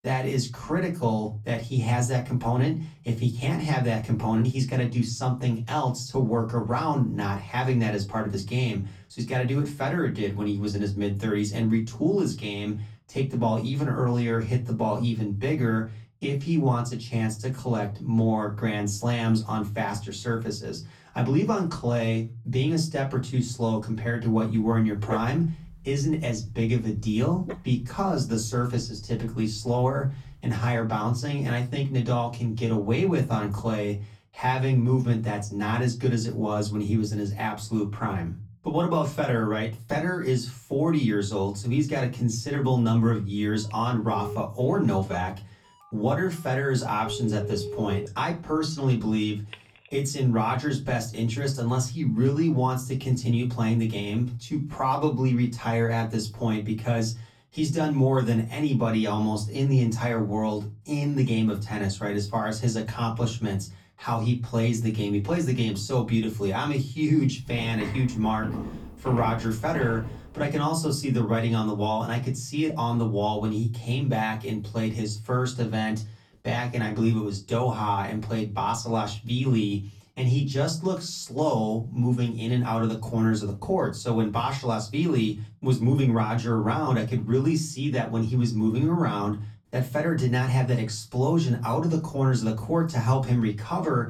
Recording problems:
off-mic speech; far
room echo; very slight; dies away in 0.3 s
dog barking; noticeable; from 25 to 30 s; peak 7 dB below the speech
phone ringing; noticeable; from 44 to 50 s; peak 8 dB below the speech
footsteps; noticeable; from 1:07 to 1:10; peak 7 dB below the speech

